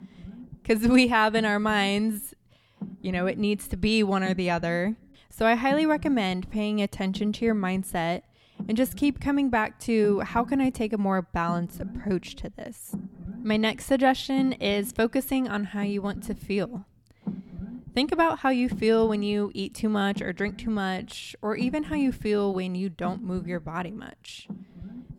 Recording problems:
low rumble; faint; throughout; 20 dB below the speech

